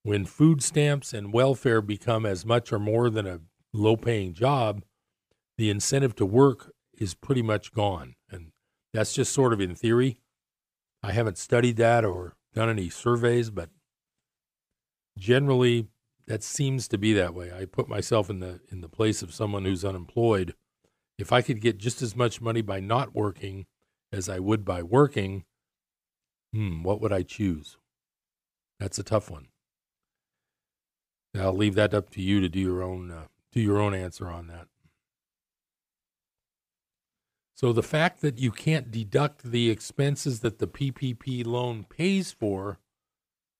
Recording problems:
none

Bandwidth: 15 kHz